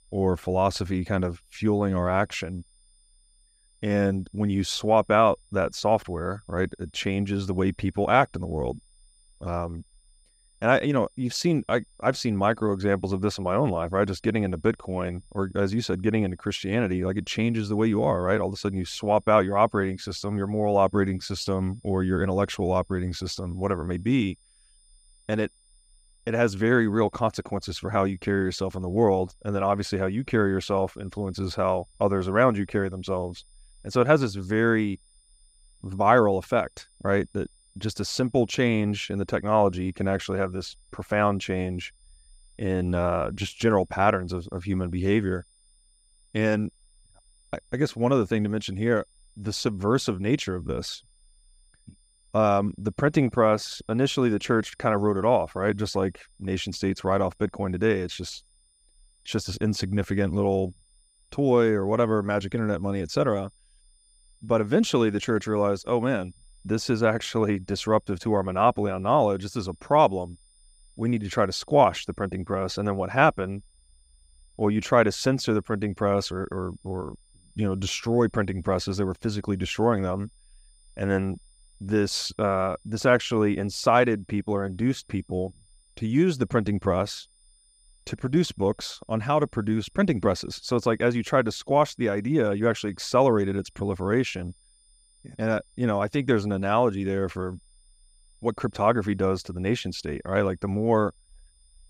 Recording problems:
high-pitched whine; faint; throughout; 9.5 kHz, 35 dB below the speech

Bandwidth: 15.5 kHz